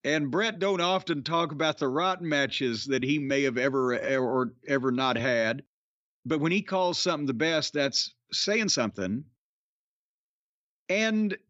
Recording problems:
uneven, jittery; strongly; from 1 to 9.5 s

